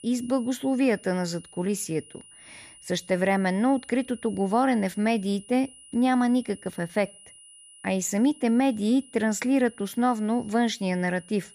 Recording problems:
high-pitched whine; faint; throughout; 10 kHz, 20 dB below the speech

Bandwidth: 14.5 kHz